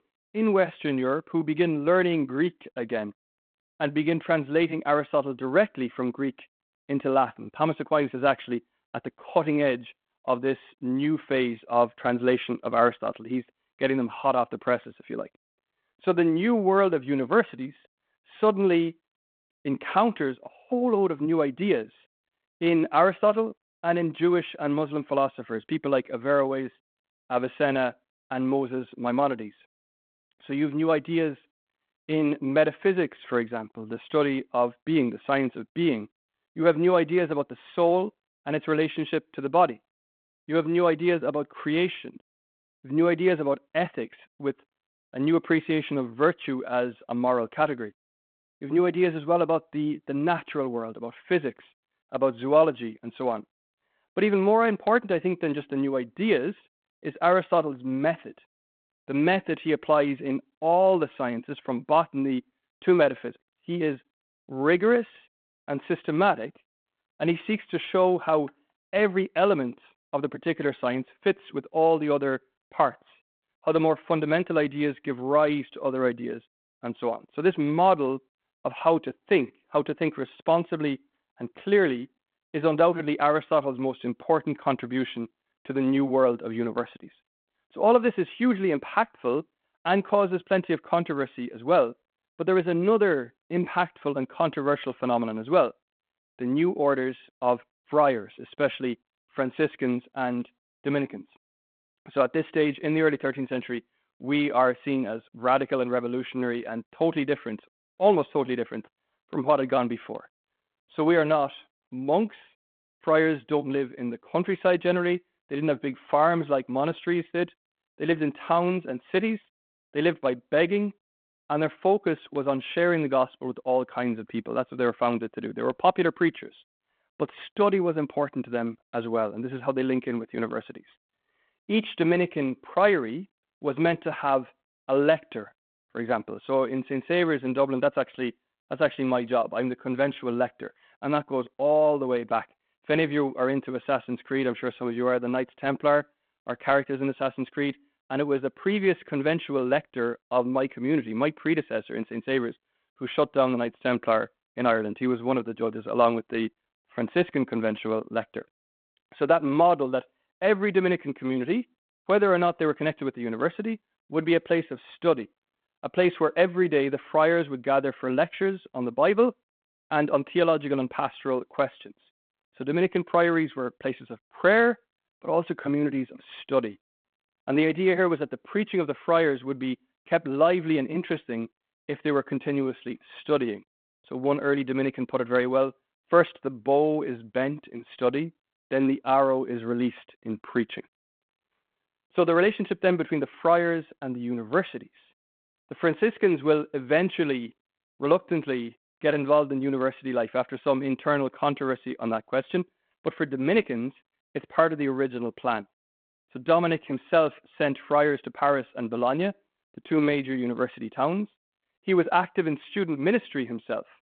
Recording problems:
phone-call audio; nothing above 3.5 kHz

